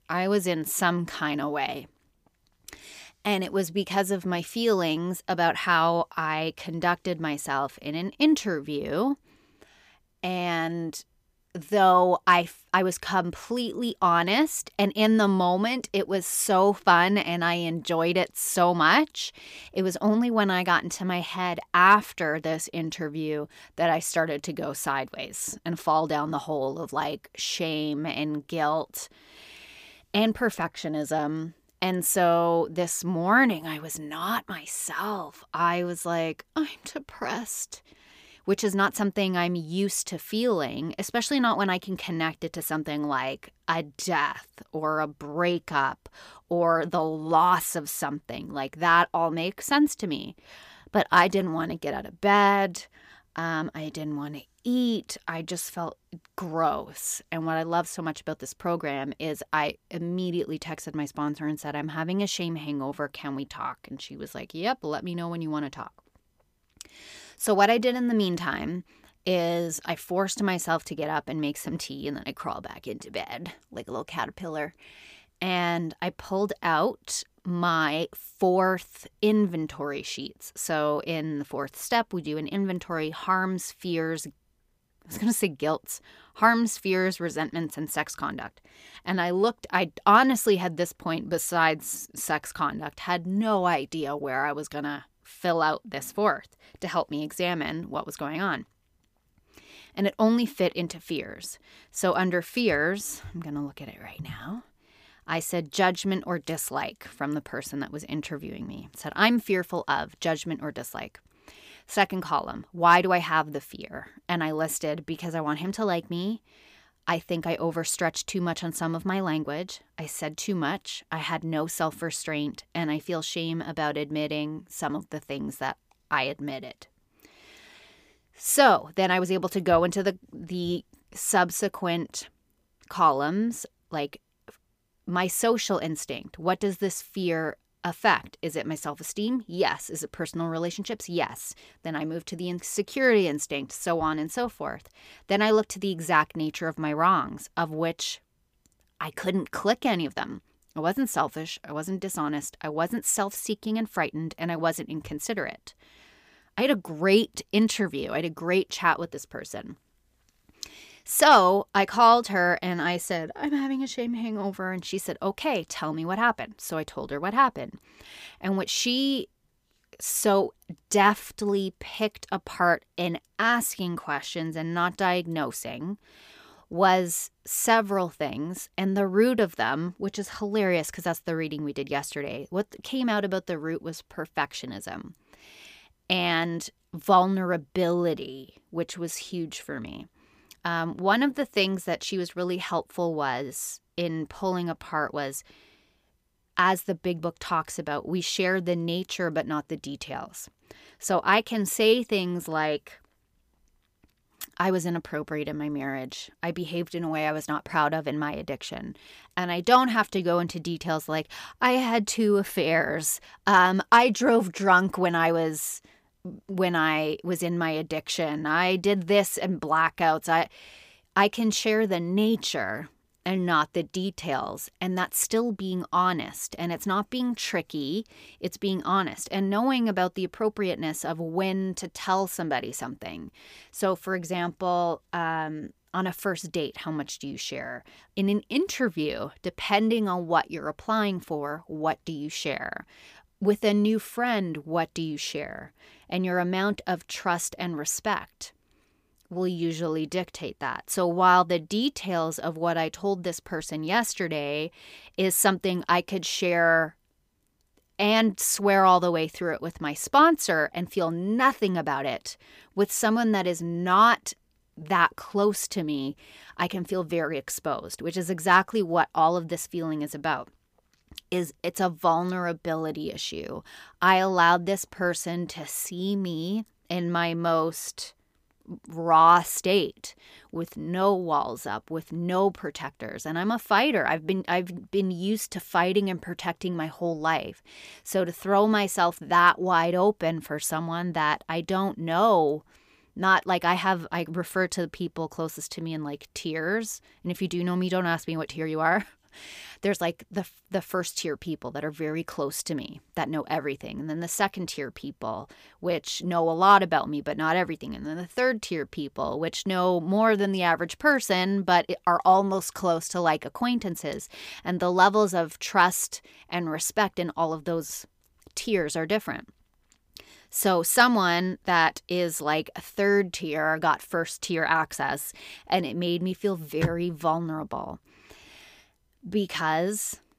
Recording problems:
none

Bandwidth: 15 kHz